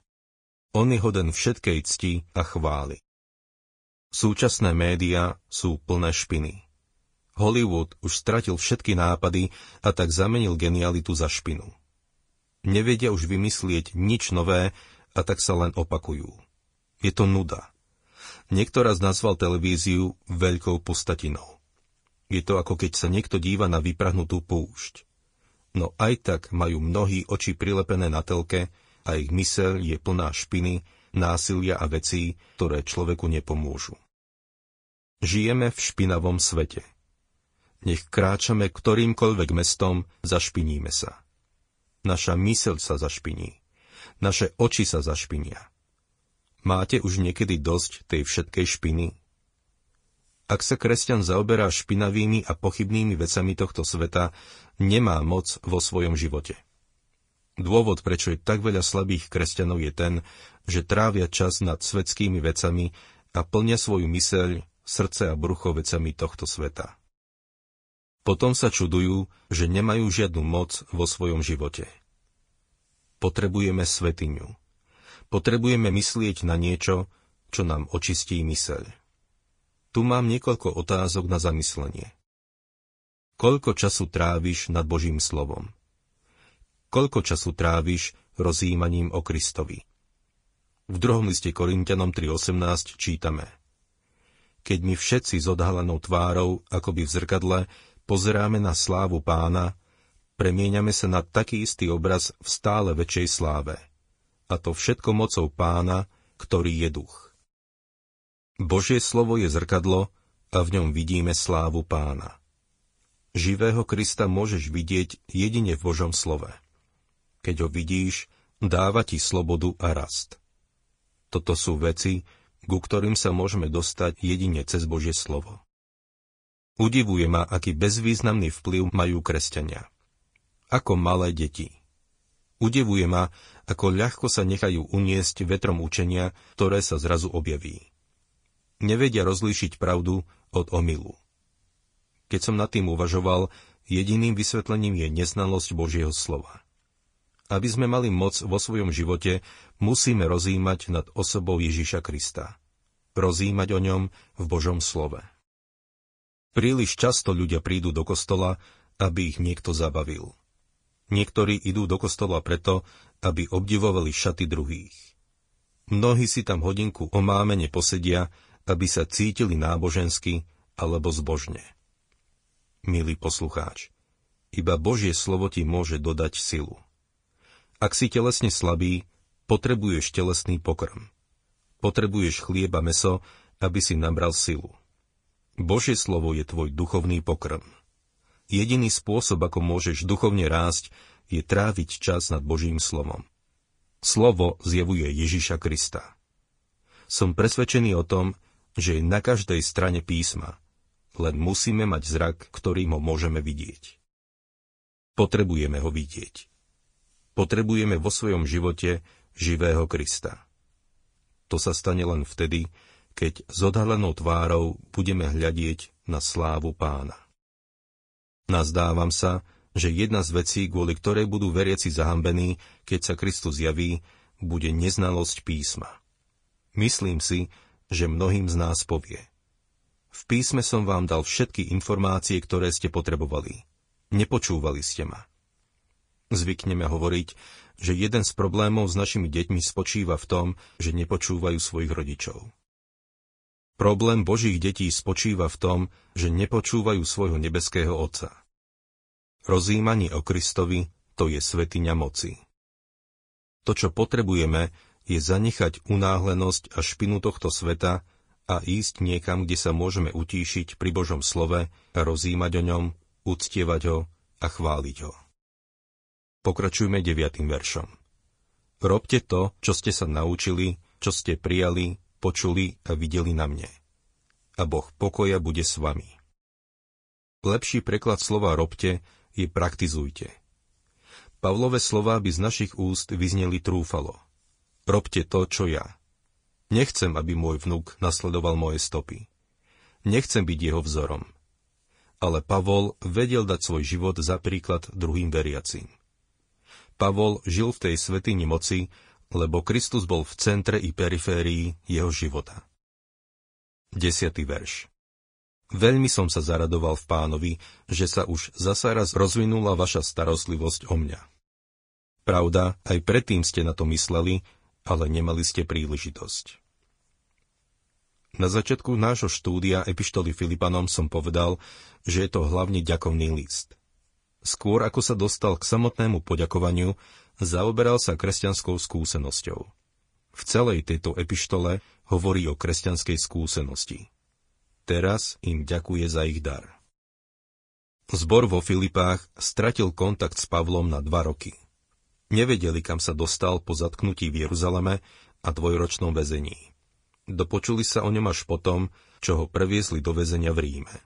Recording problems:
garbled, watery; slightly

